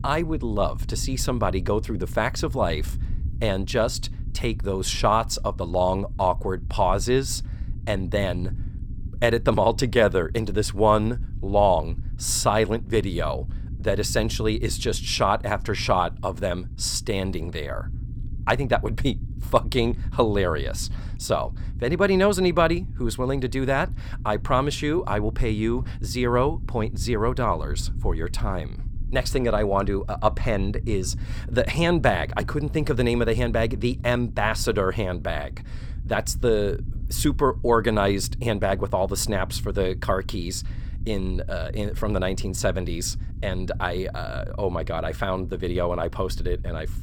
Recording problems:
low rumble; faint; throughout; 25 dB below the speech

